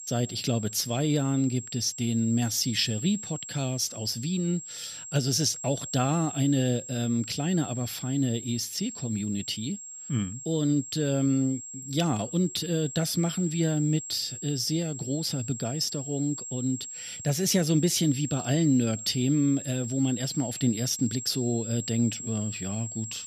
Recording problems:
high-pitched whine; loud; throughout; 7.5 kHz, 9 dB below the speech

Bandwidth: 14.5 kHz